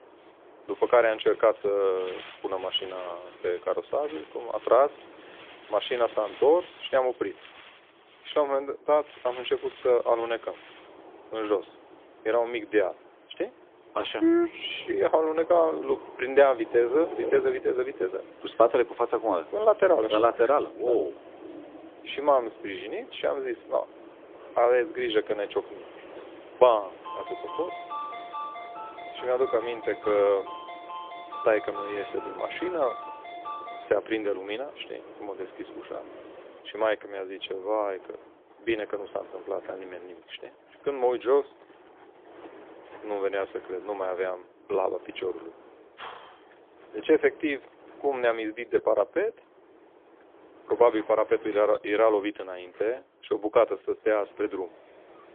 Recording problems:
phone-call audio; poor line; nothing above 3.5 kHz
wind in the background; faint; throughout; 20 dB below the speech
phone ringing; noticeable; from 27 to 34 s; peak 9 dB below the speech

